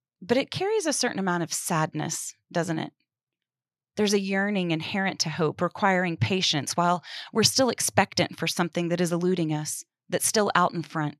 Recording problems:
none

